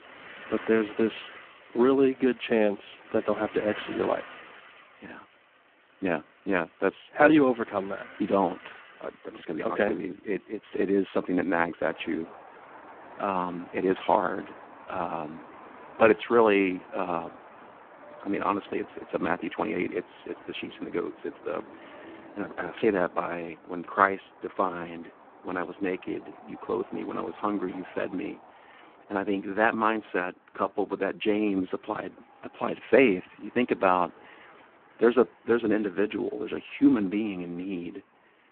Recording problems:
phone-call audio; poor line
traffic noise; faint; throughout; 20 dB below the speech

